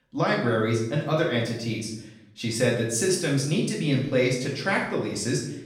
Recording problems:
off-mic speech; far
room echo; noticeable; dies away in 0.7 s

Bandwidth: 17 kHz